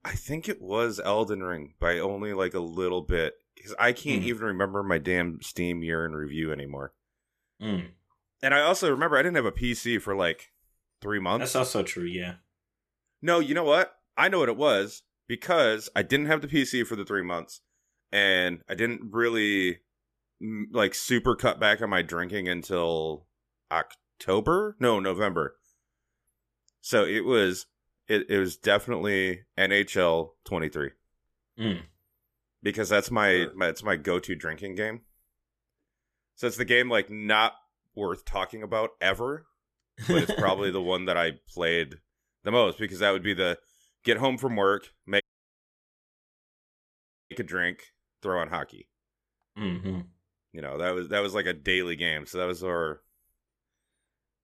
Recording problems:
audio cutting out; at 45 s for 2 s

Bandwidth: 14.5 kHz